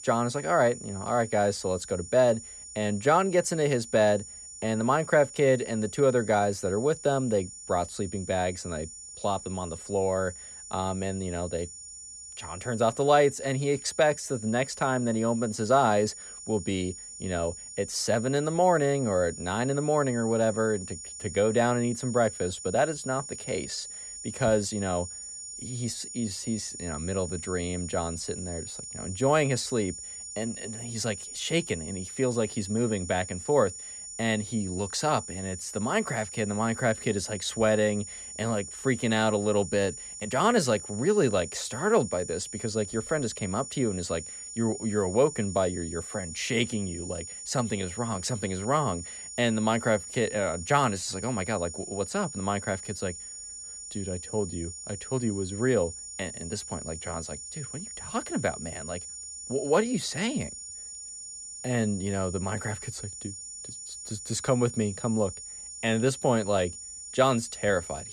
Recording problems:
high-pitched whine; noticeable; throughout; 7 kHz, 10 dB below the speech
uneven, jittery; slightly; from 23 to 56 s

